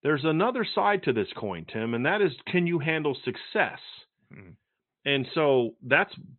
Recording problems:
high frequencies cut off; severe; nothing above 4 kHz

